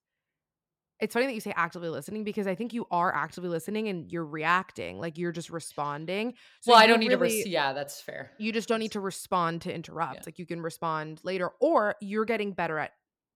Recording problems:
none

